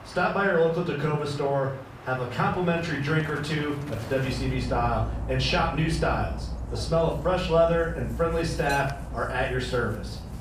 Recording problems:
off-mic speech; far
room echo; slight; dies away in 0.5 s
animal sounds; noticeable; throughout; 10 dB below the speech

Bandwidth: 15 kHz